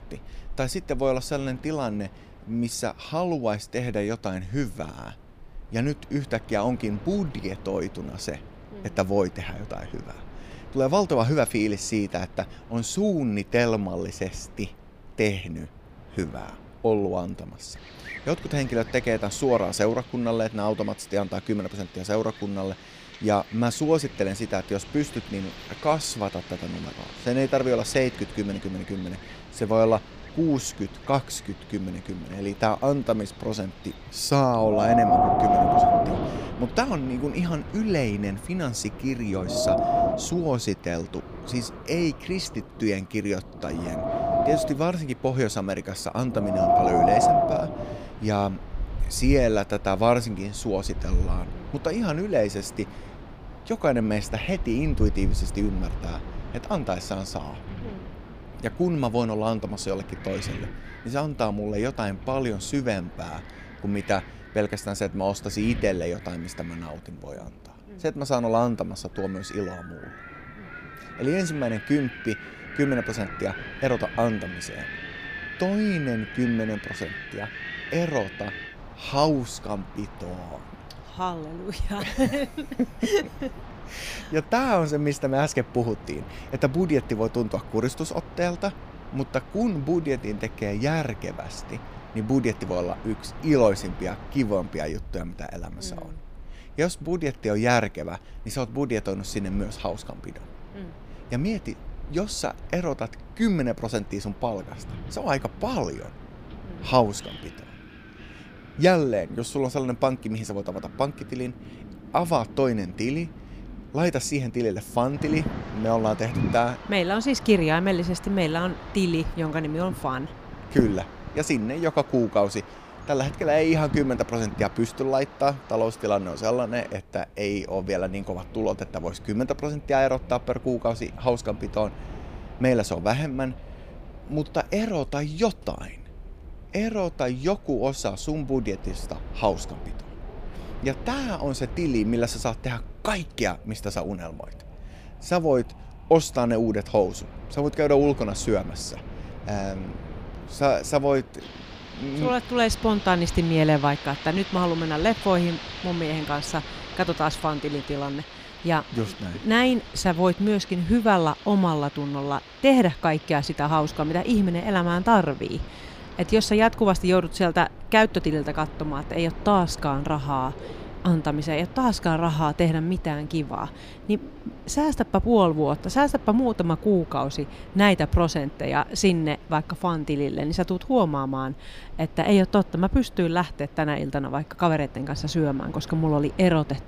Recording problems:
wind in the background; loud; throughout; 9 dB below the speech

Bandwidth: 15 kHz